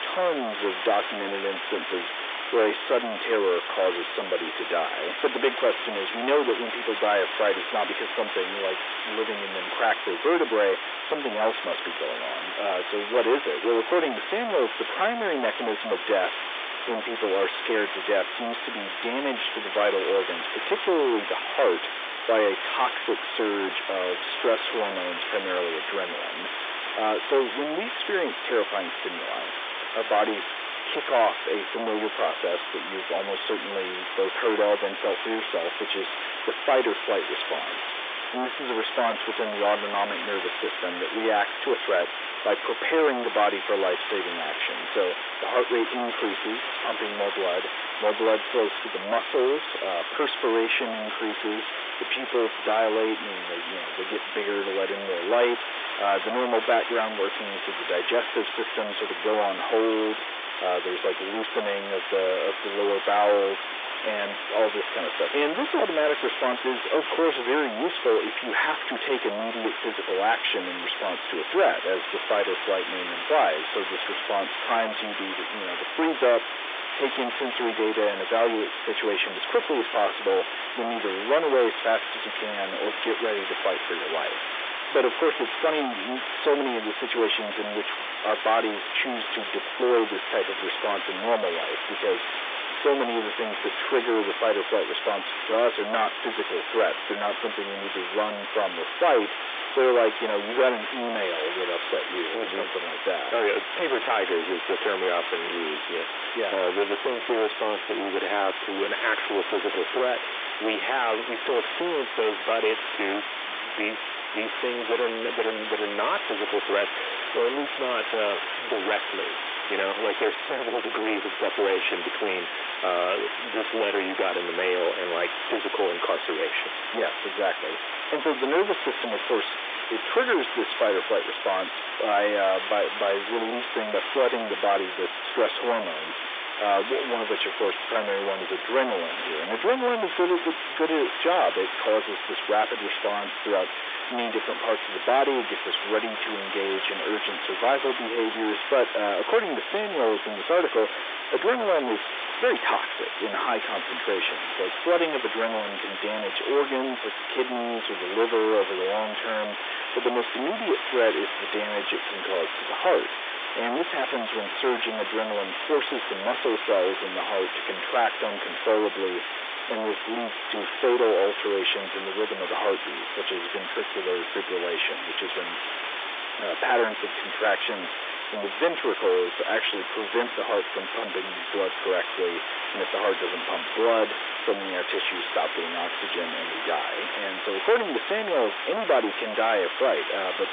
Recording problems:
distortion; heavy; 17% of the sound clipped
phone-call audio; nothing above 3 kHz
hiss; loud; throughout; 4 dB below the speech

